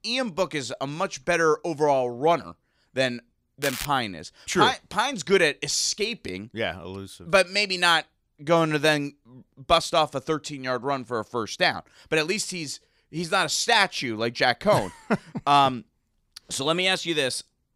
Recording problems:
crackling; loud; at 3.5 s; 9 dB below the speech

